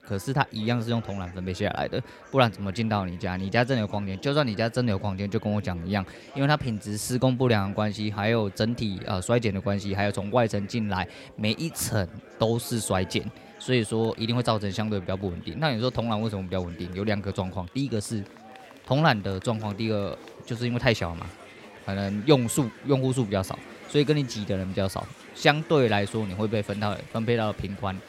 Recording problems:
chatter from many people; noticeable; throughout; 20 dB below the speech

